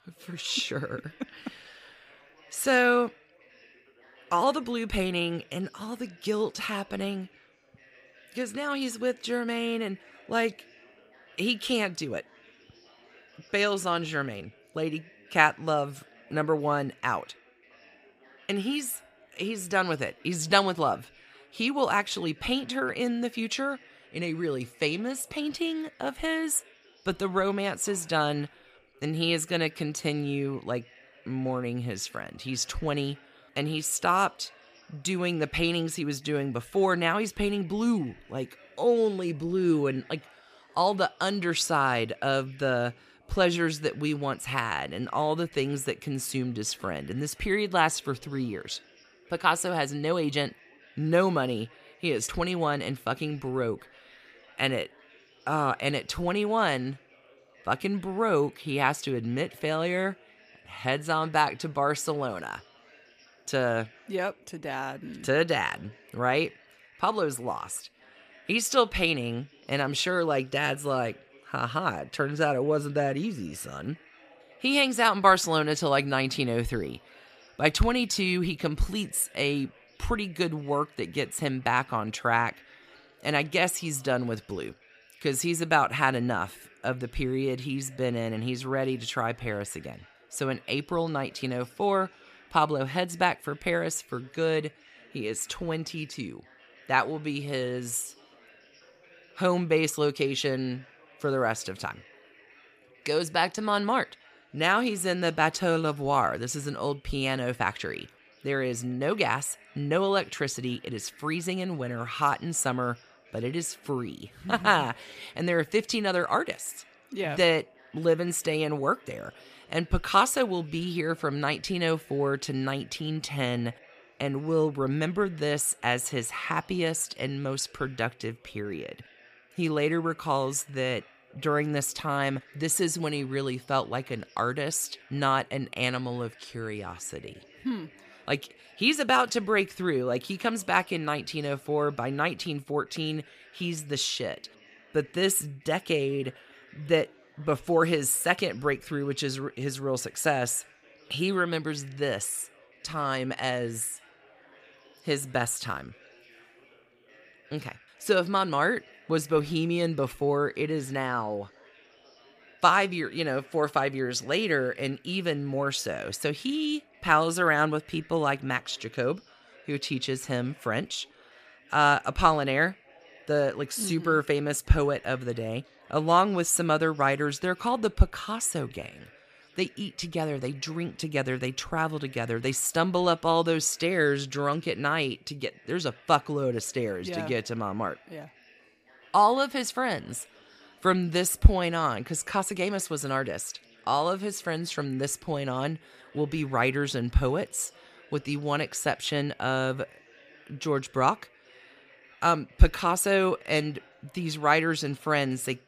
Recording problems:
background chatter; faint; throughout; 3 voices, 25 dB below the speech

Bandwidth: 15 kHz